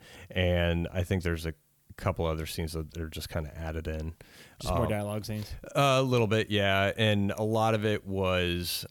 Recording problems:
none

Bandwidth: 18.5 kHz